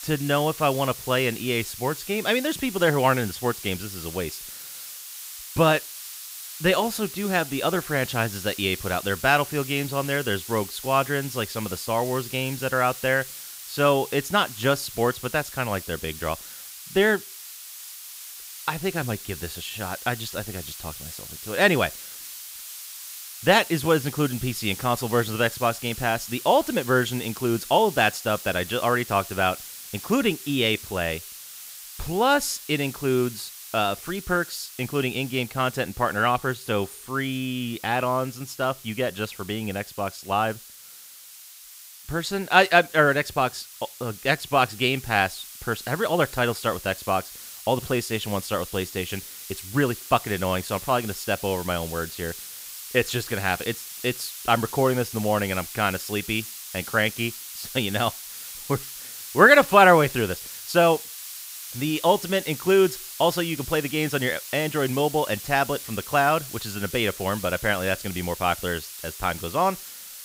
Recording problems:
hiss; noticeable; throughout; 10 dB below the speech

